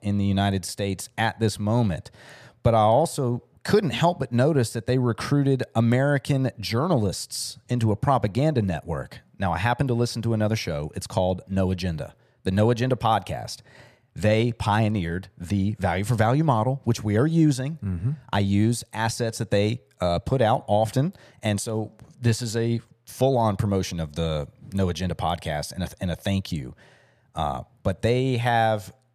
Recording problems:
none

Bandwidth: 15 kHz